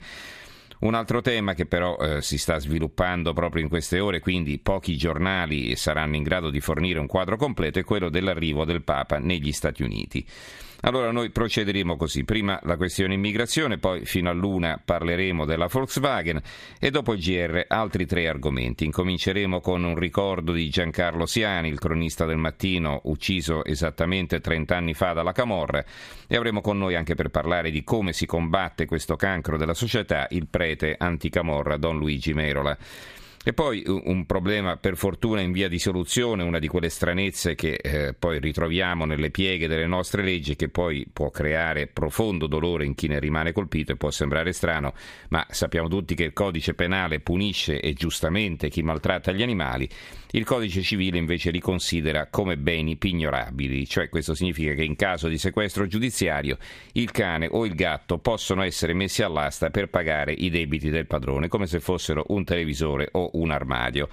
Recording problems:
squashed, flat; somewhat

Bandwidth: 14.5 kHz